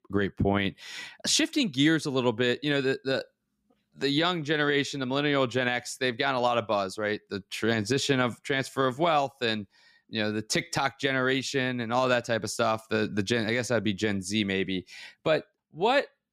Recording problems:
none

